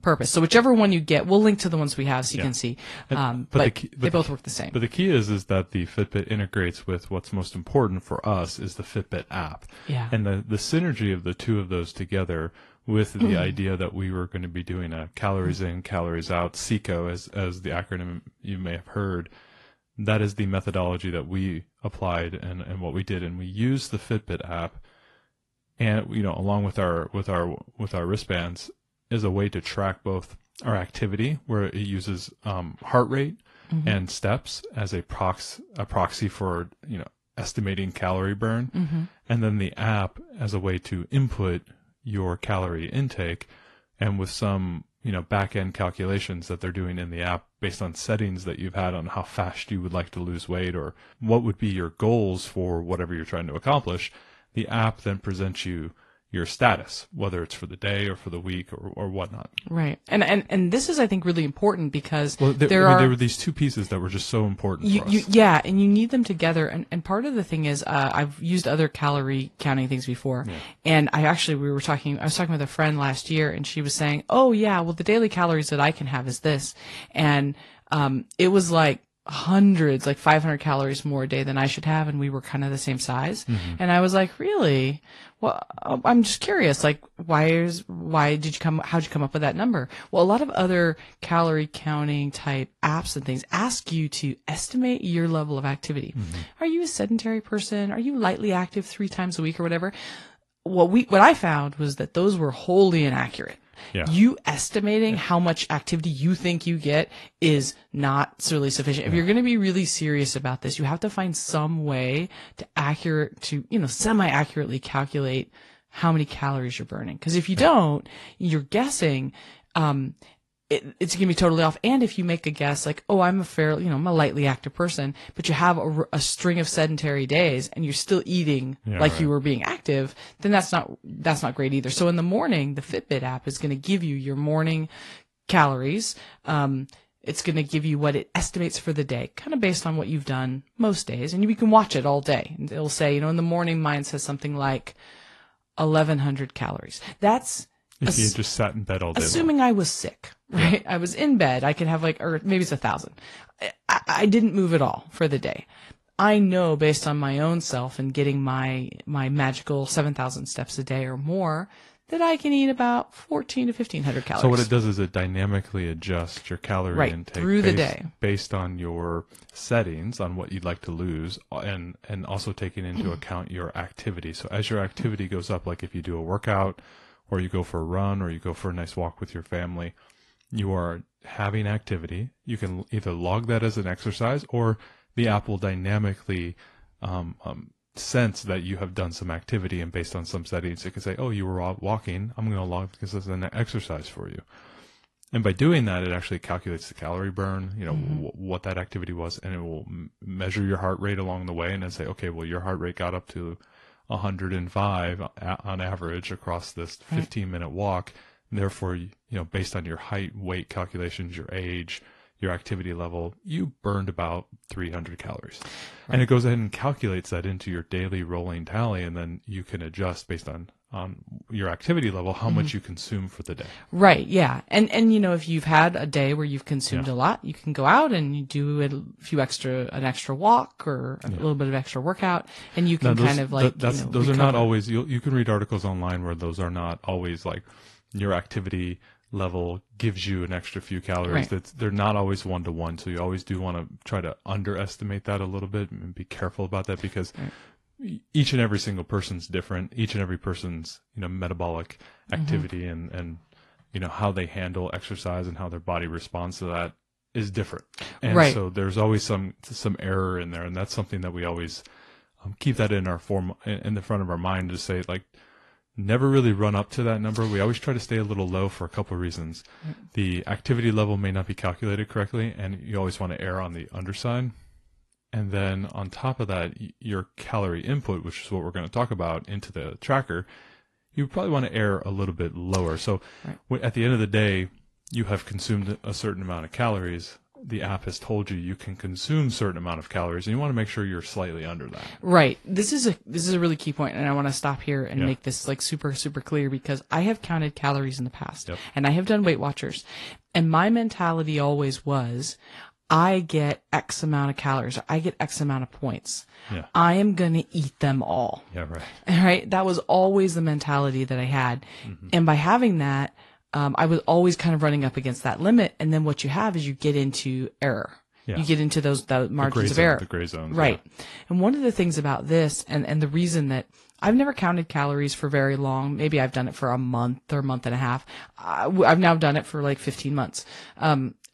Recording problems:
garbled, watery; slightly

